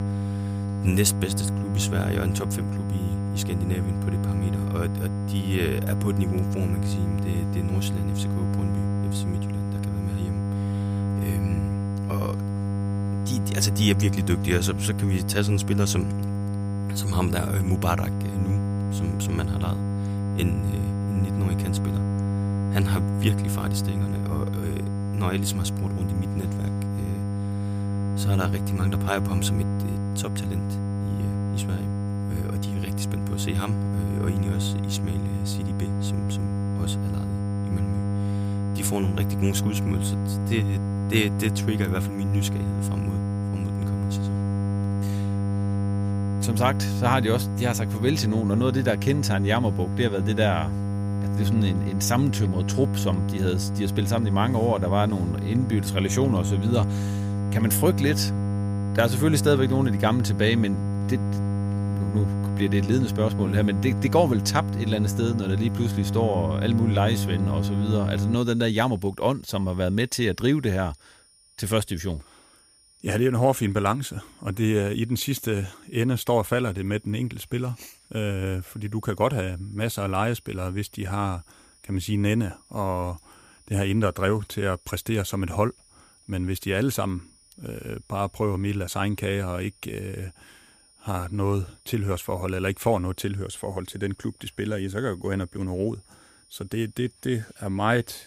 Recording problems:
electrical hum; loud; until 1:08; 50 Hz, 7 dB below the speech
high-pitched whine; faint; throughout; 9.5 kHz, 30 dB below the speech

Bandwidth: 15 kHz